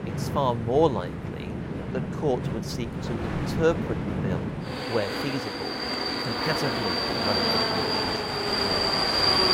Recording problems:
train or aircraft noise; very loud; throughout; 4 dB above the speech

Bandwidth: 16 kHz